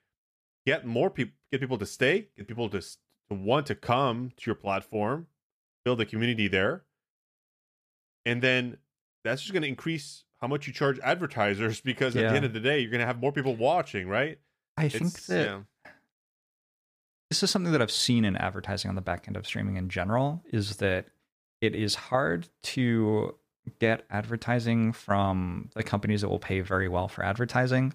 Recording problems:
none

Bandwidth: 15 kHz